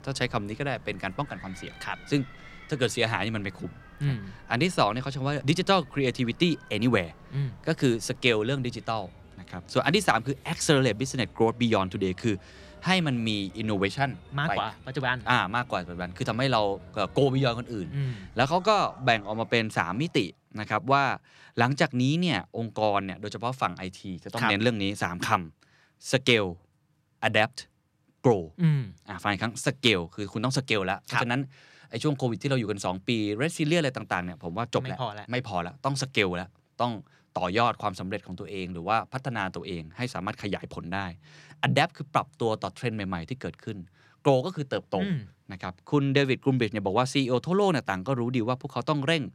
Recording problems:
animal sounds; faint; until 20 s; 25 dB below the speech

